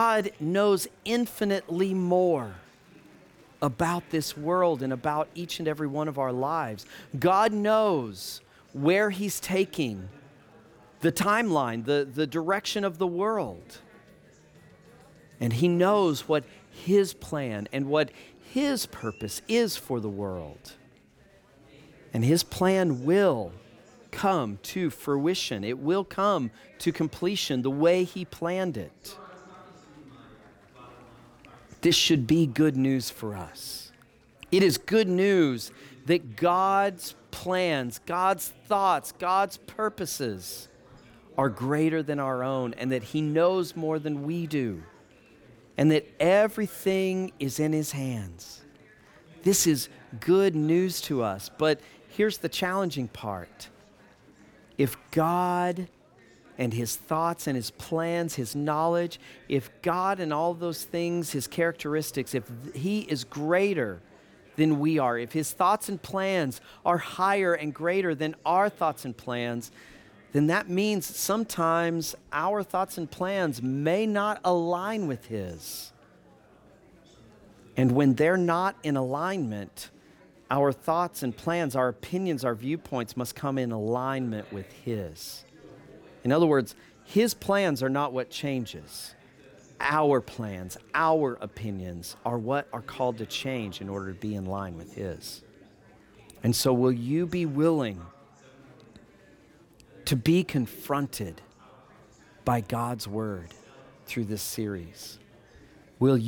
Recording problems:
chatter from many people; faint; throughout; 25 dB below the speech
abrupt cut into speech; at the start and the end

